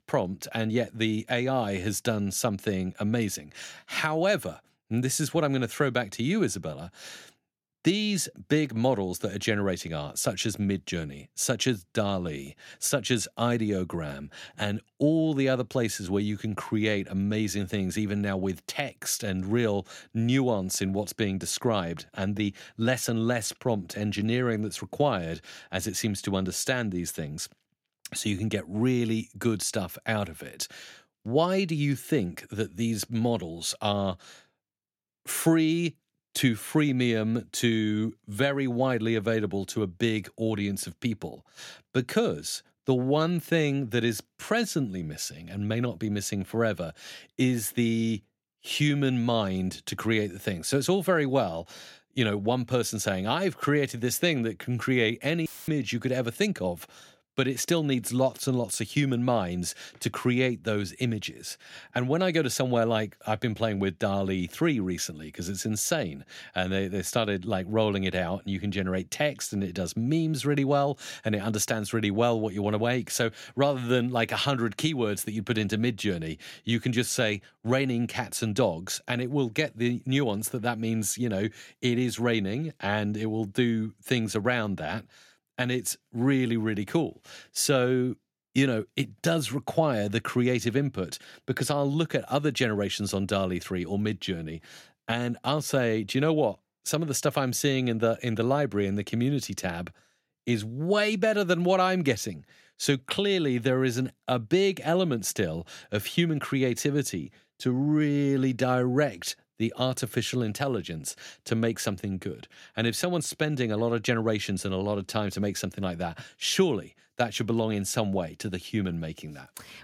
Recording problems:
audio cutting out; filled with static; at 55 s

